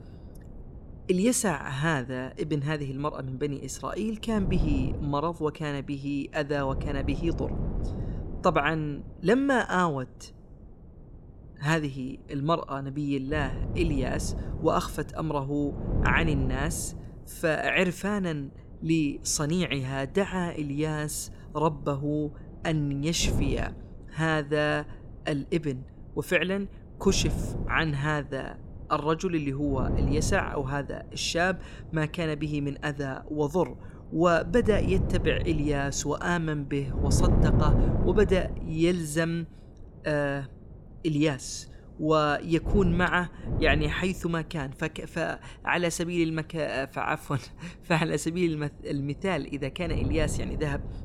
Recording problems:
wind noise on the microphone; occasional gusts; 10 dB below the speech

